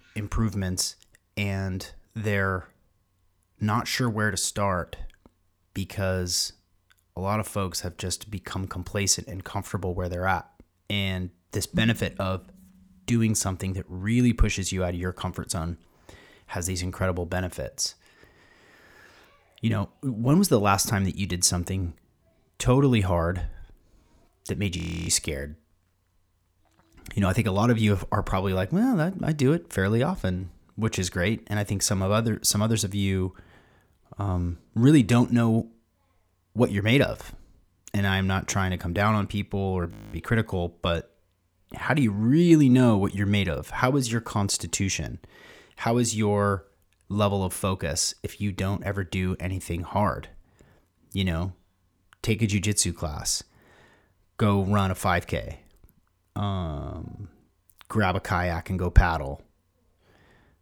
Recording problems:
audio freezing; at 25 s and at 40 s

